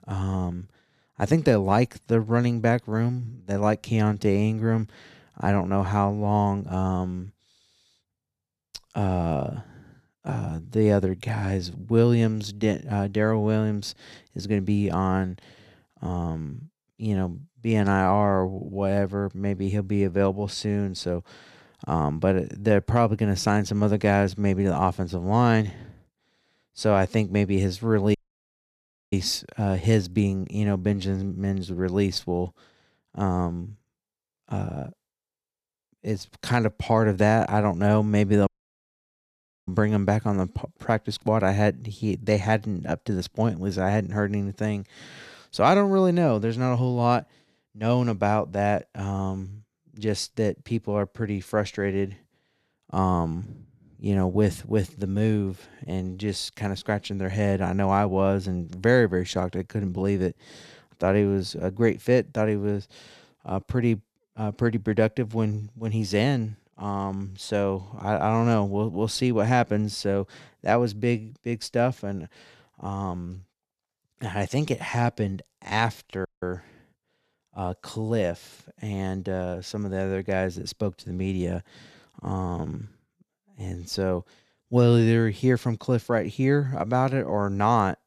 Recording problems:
audio cutting out; at 28 s for 1 s, at 38 s for 1 s and at 1:16

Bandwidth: 14 kHz